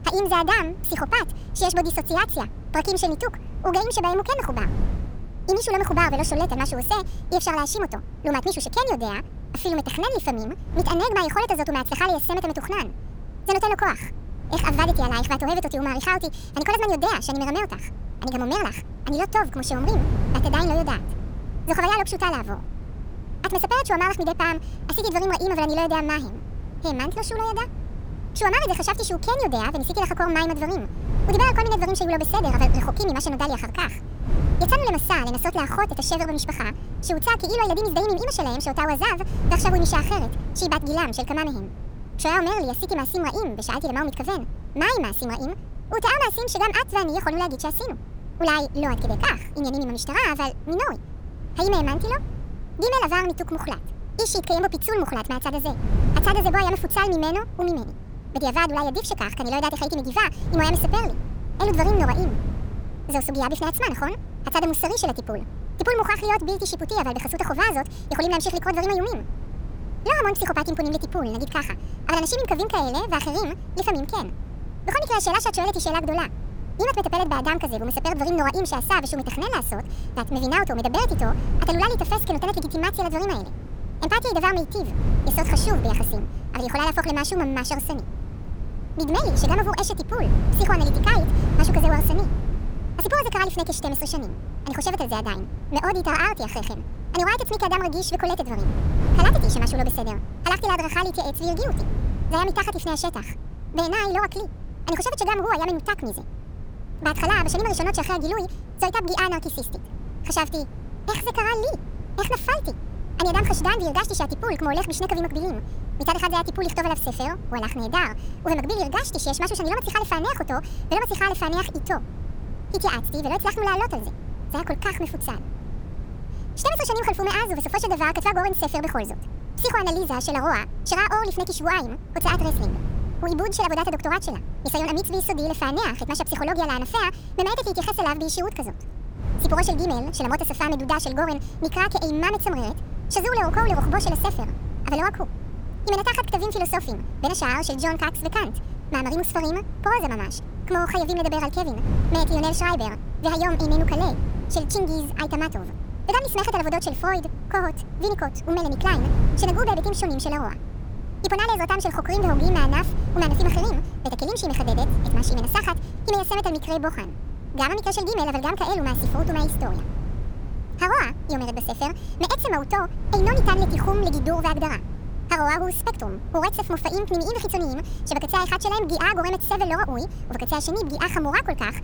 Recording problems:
wrong speed and pitch; too fast and too high; 1.6 times normal speed
wind noise on the microphone; occasional gusts; 20 dB below the speech

